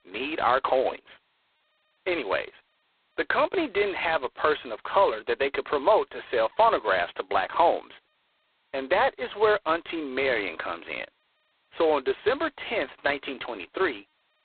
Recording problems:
phone-call audio; poor line; nothing above 4 kHz
muffled; very slightly; fading above 3.5 kHz

